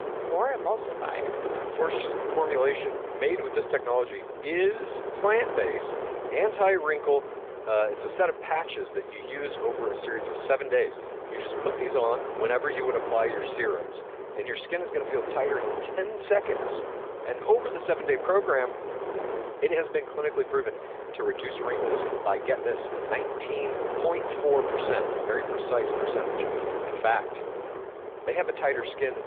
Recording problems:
phone-call audio; nothing above 3.5 kHz
wind noise on the microphone; heavy; 5 dB below the speech

